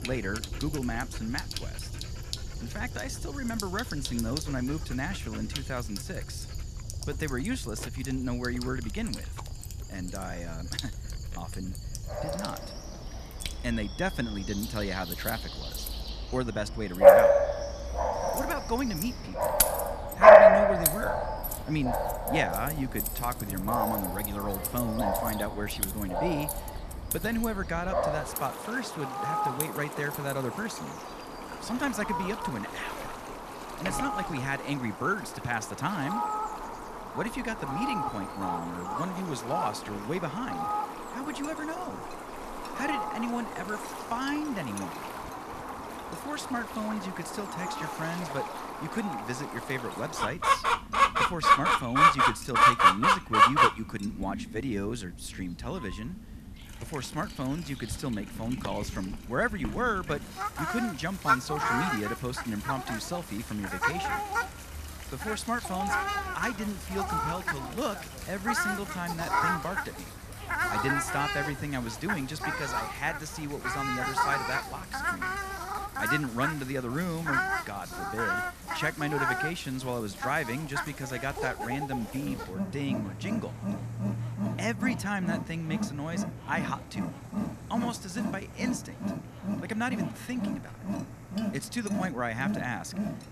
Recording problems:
animal sounds; very loud; throughout; 5 dB above the speech
household noises; loud; throughout; 7 dB below the speech

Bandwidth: 14.5 kHz